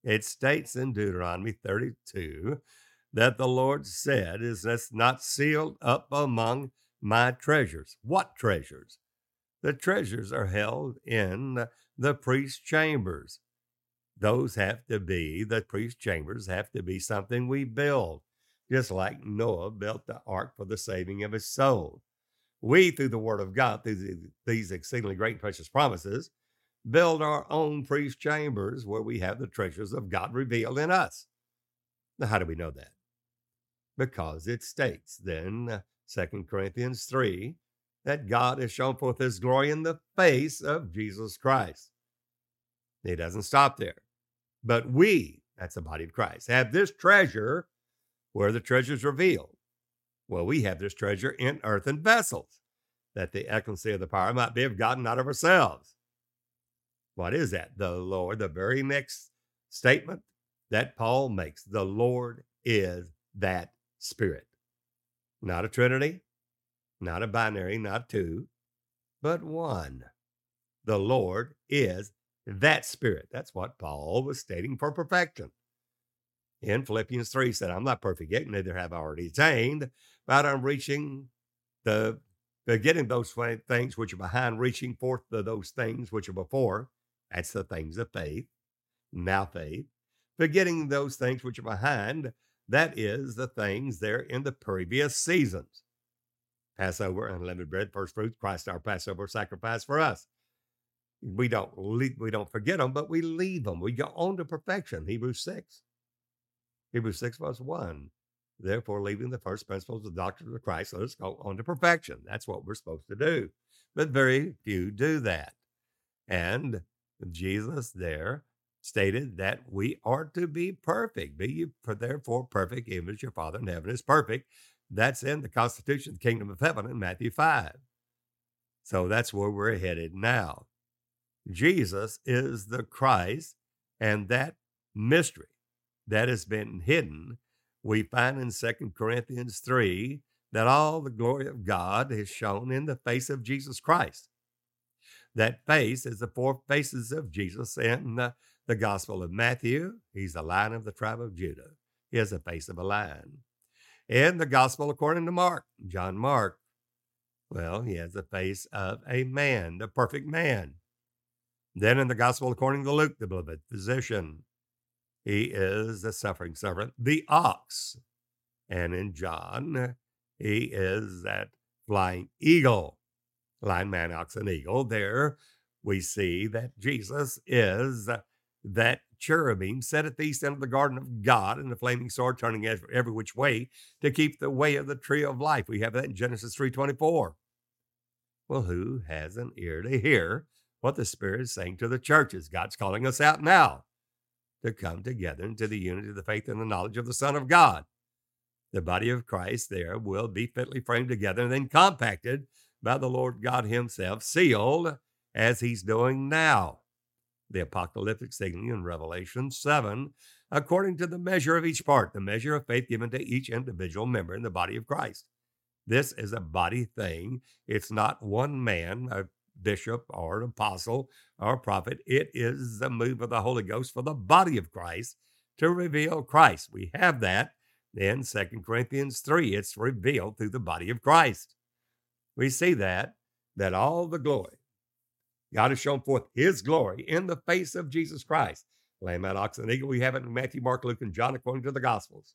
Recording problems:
none

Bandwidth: 16.5 kHz